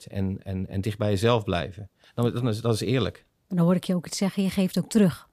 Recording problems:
none

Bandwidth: 15 kHz